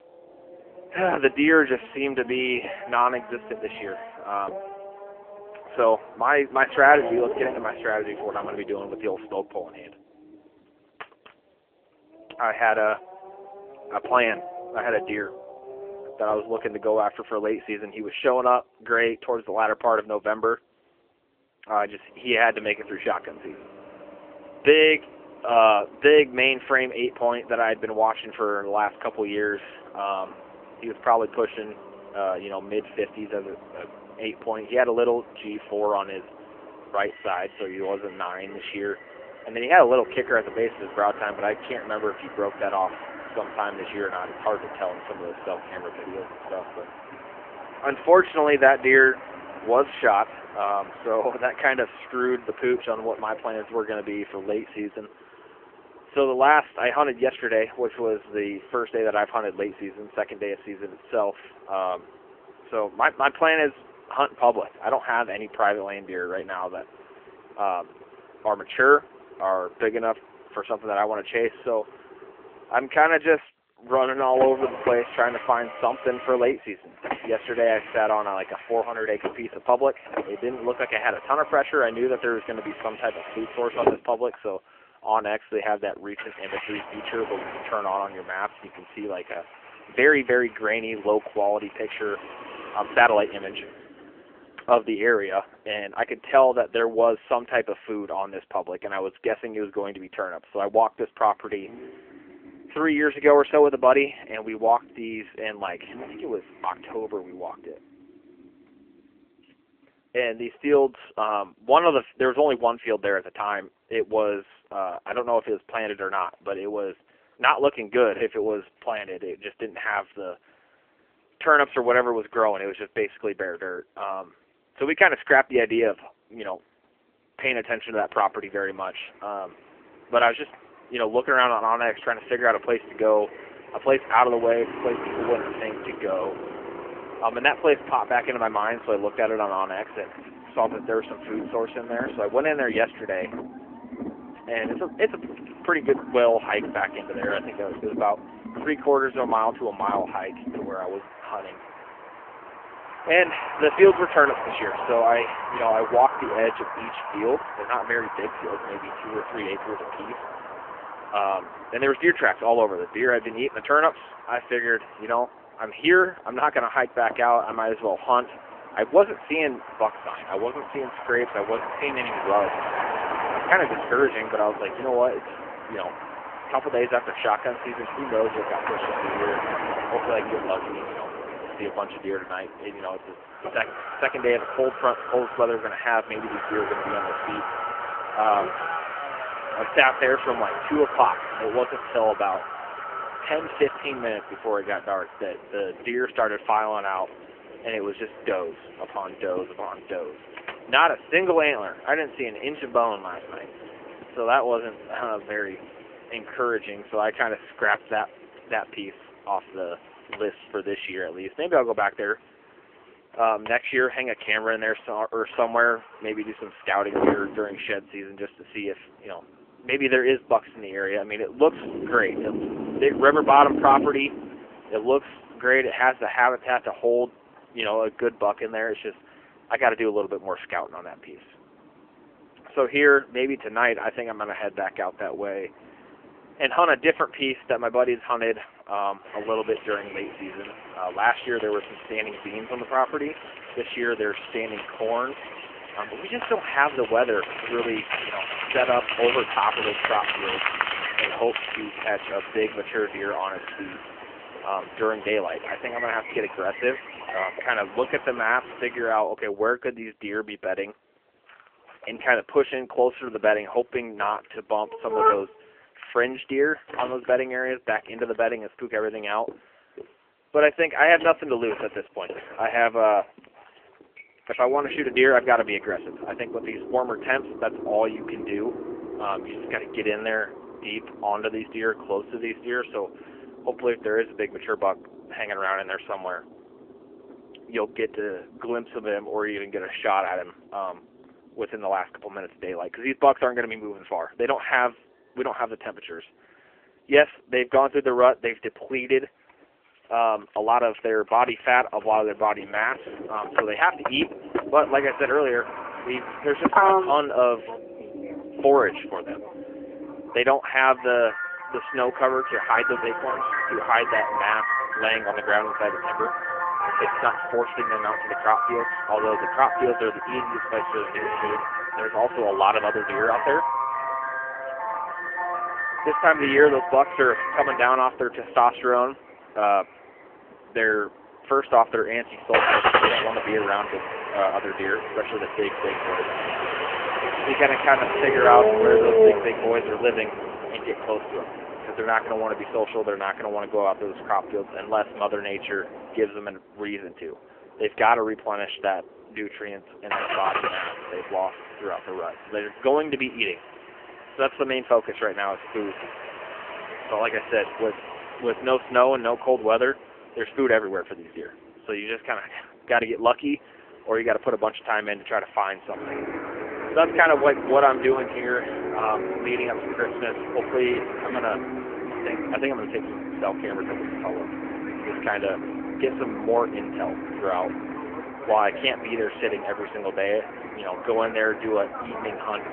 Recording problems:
phone-call audio; poor line; nothing above 3 kHz
traffic noise; loud; throughout; 7 dB below the speech

